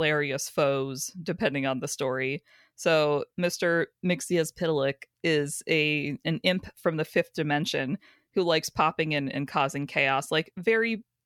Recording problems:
abrupt cut into speech; at the start

